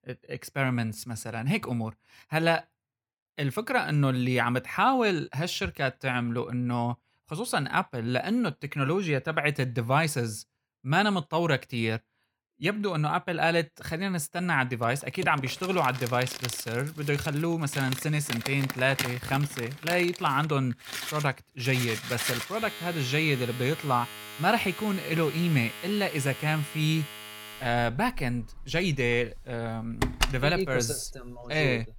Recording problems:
household noises; loud; from 15 s on; 9 dB below the speech

